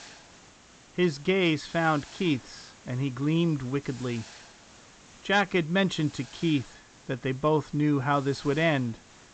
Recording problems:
high frequencies cut off; noticeable; nothing above 8 kHz
hiss; faint; throughout; 20 dB below the speech

